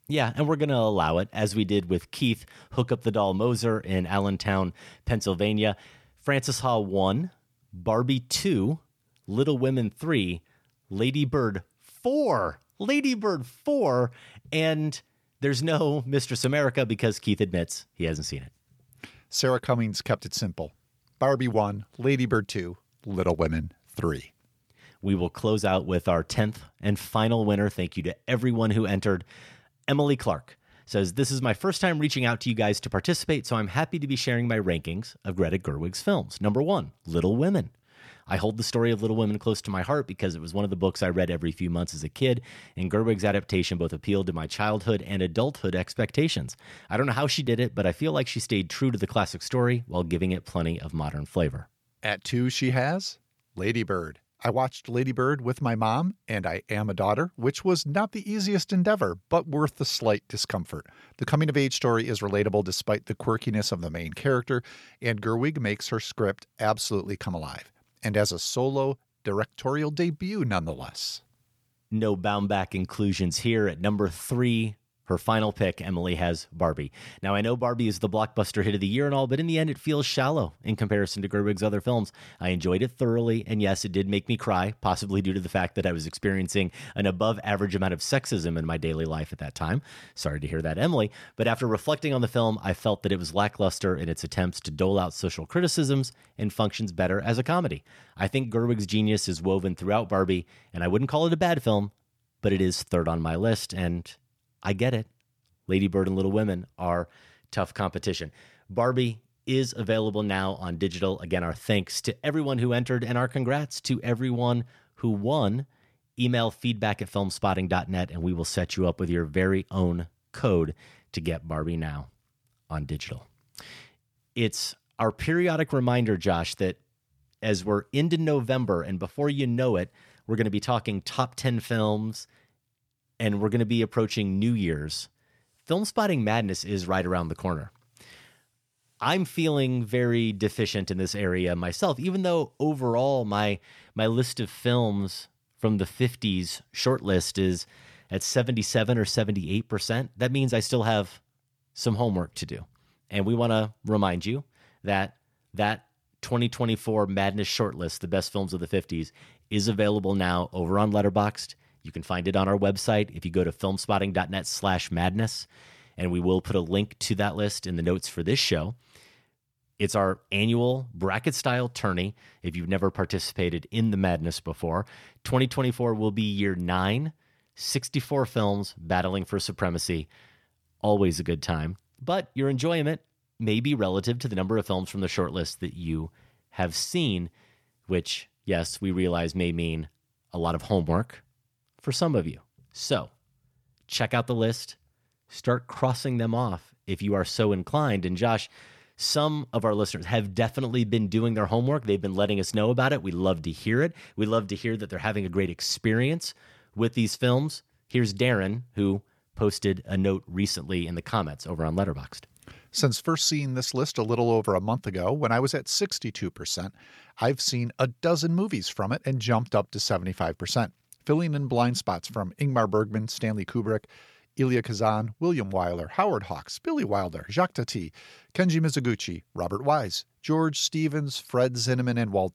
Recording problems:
none

